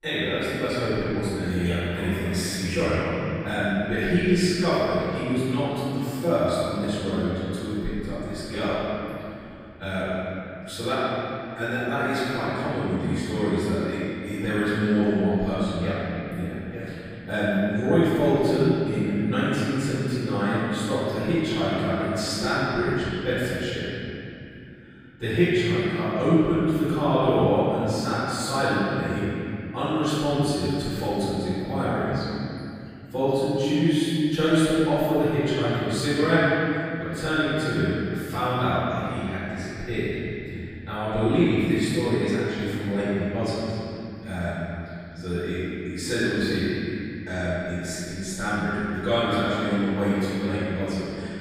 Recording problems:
room echo; strong; dies away in 2.9 s
off-mic speech; far

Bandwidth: 15.5 kHz